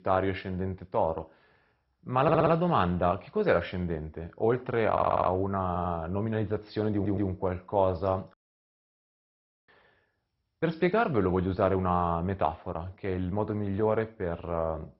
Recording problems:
garbled, watery; badly; nothing above 5.5 kHz
audio stuttering; 4 times, first at 2 s
audio cutting out; at 8.5 s for 1.5 s

